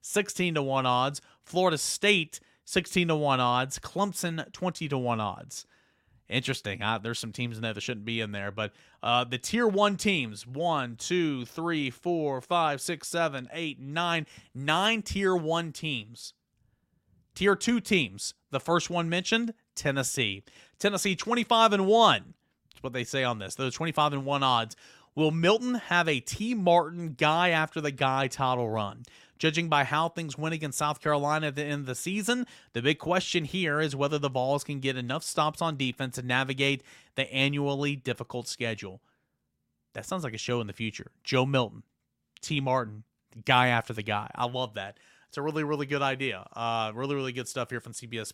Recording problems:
none

